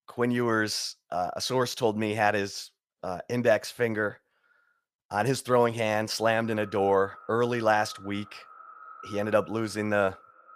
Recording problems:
echo of what is said; faint; from 6 s on; 360 ms later, 20 dB below the speech

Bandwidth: 15 kHz